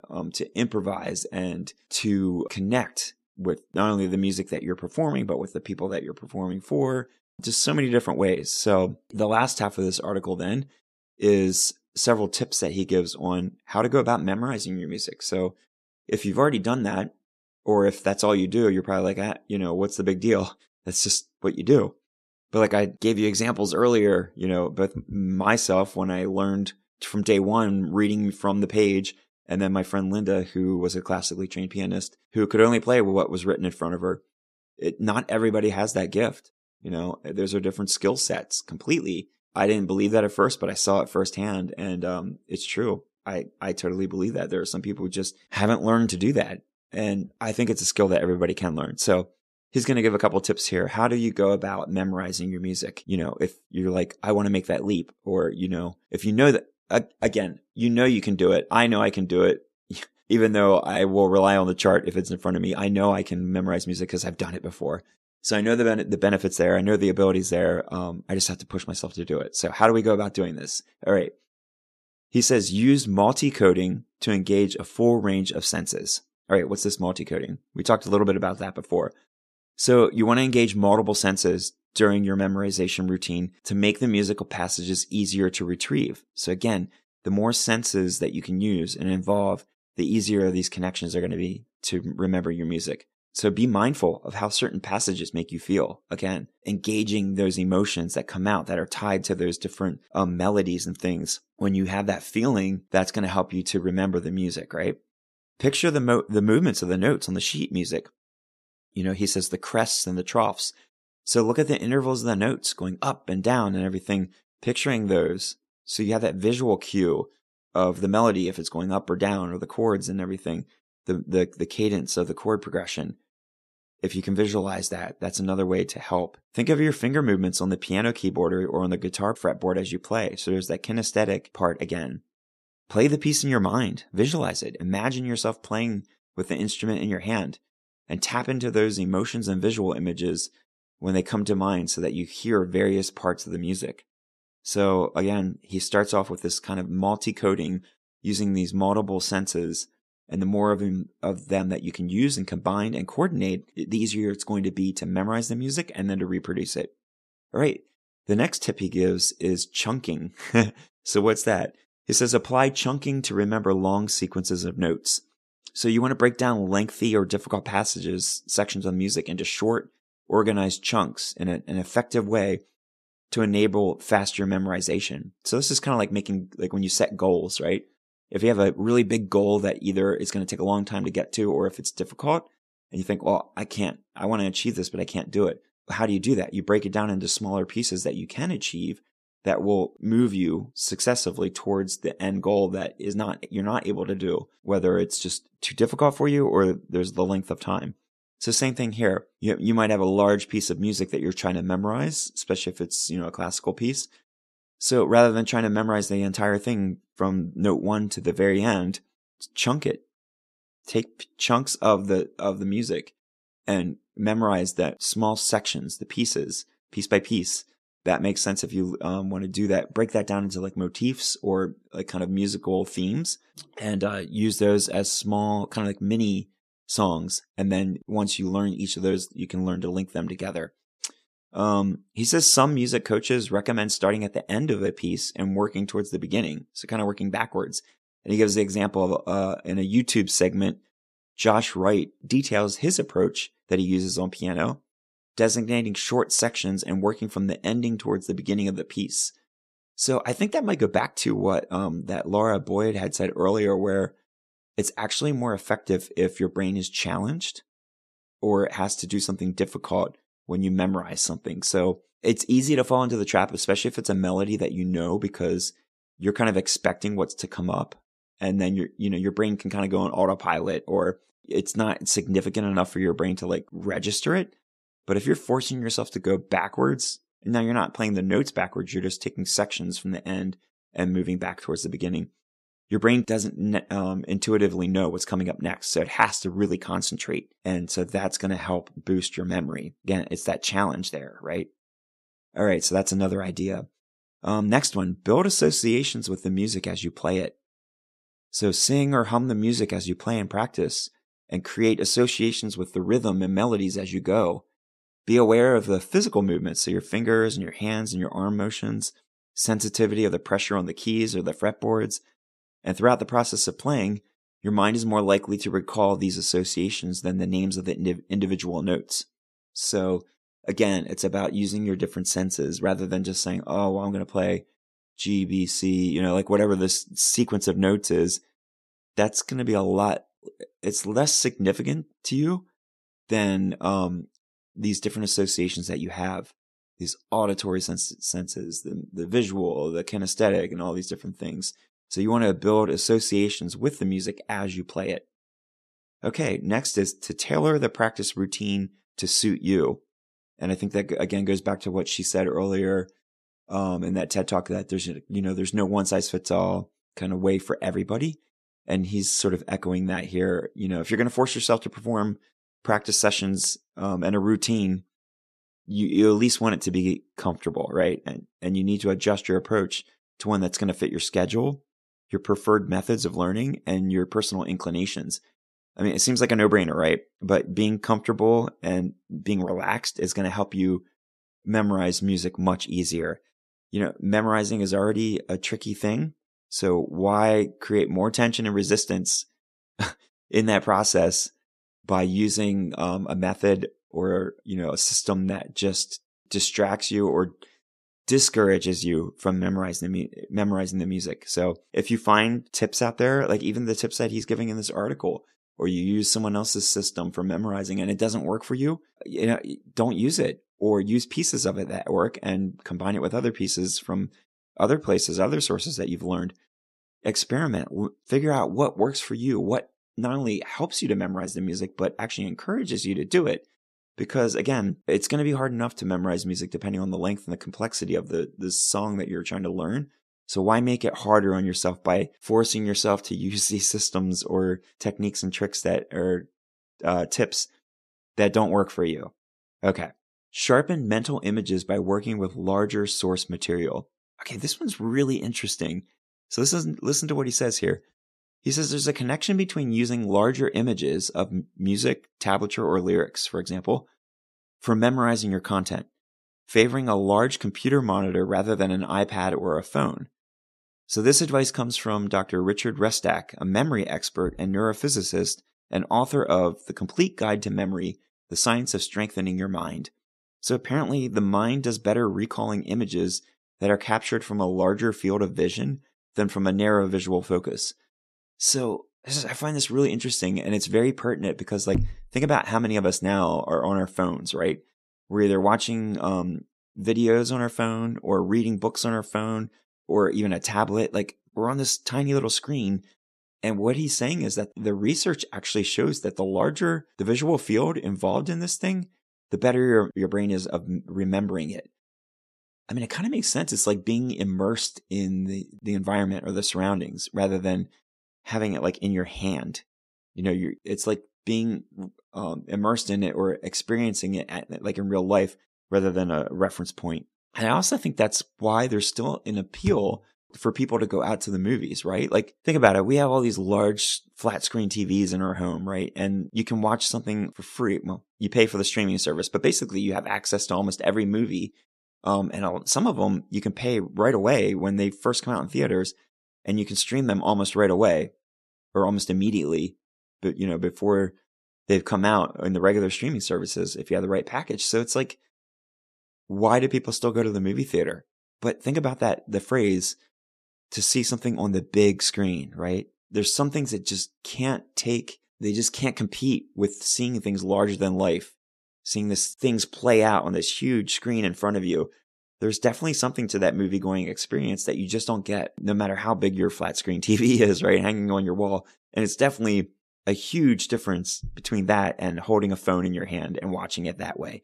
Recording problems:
none

